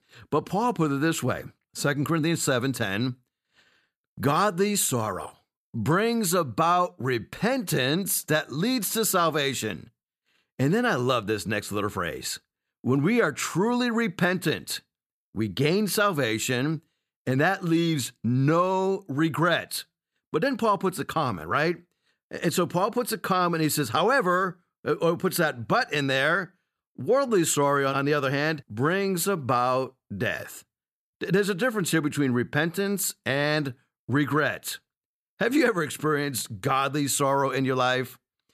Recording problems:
none

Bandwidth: 14.5 kHz